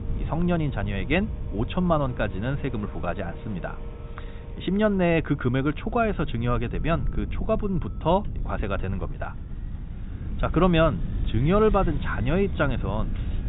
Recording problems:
high frequencies cut off; severe; nothing above 4 kHz
machinery noise; faint; throughout; 20 dB below the speech
traffic noise; faint; throughout; 25 dB below the speech
low rumble; faint; throughout; 20 dB below the speech

